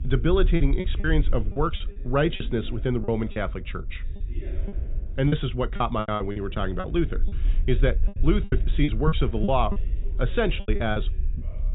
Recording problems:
high frequencies cut off; severe; nothing above 4 kHz
low rumble; noticeable; throughout; 20 dB below the speech
voice in the background; faint; throughout; 20 dB below the speech
choppy; very; 12% of the speech affected

